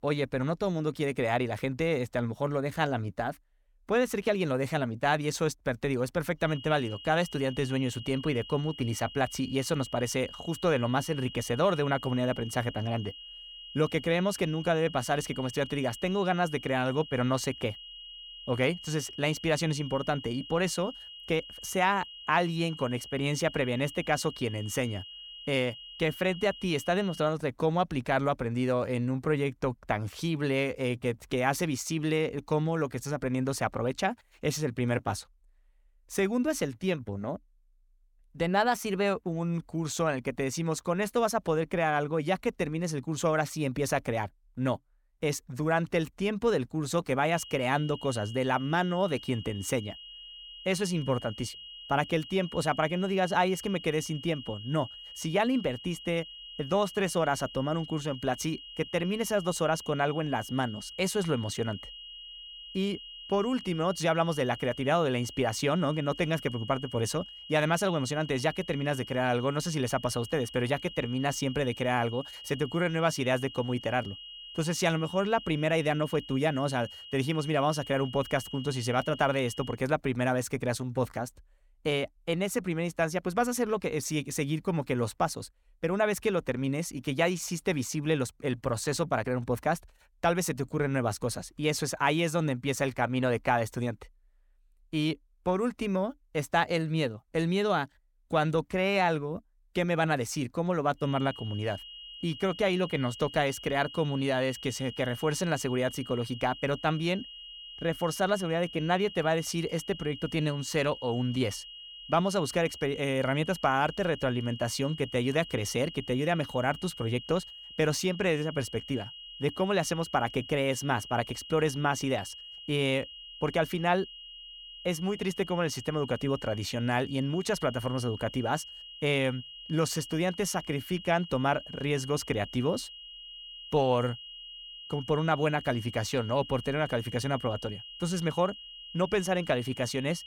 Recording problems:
high-pitched whine; noticeable; from 6.5 to 27 s, from 47 s to 1:20 and from 1:41 on; 3 kHz, 15 dB below the speech

